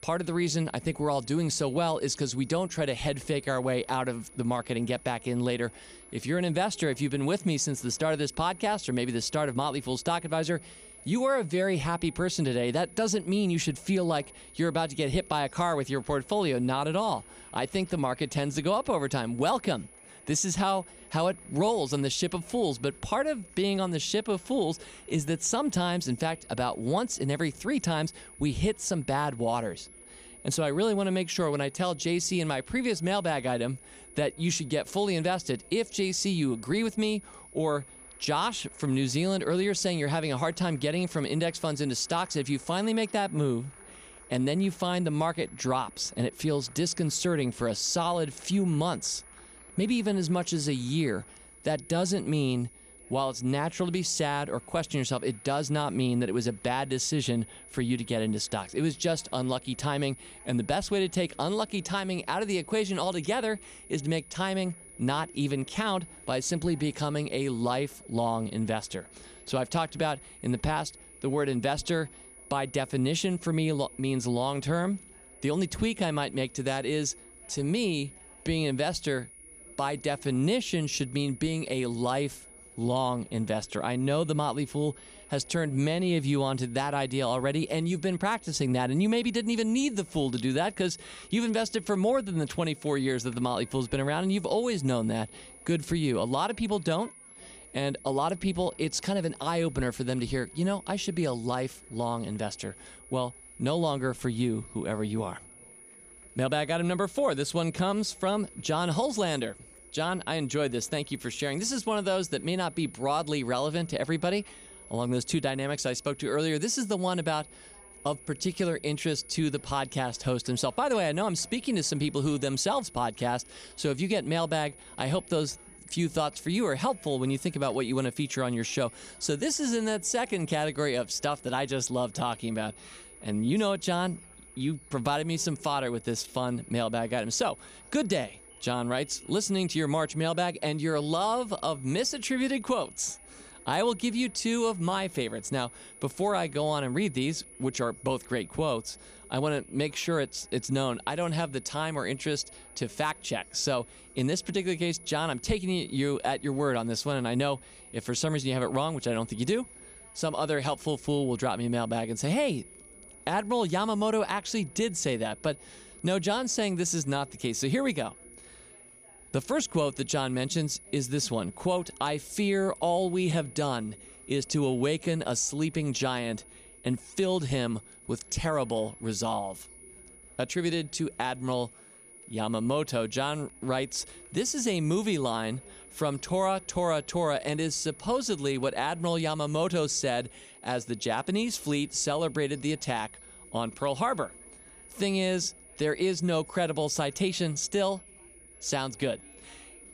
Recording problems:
high-pitched whine; noticeable; throughout; 10.5 kHz, 20 dB below the speech
chatter from many people; faint; throughout; 30 dB below the speech

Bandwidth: 15 kHz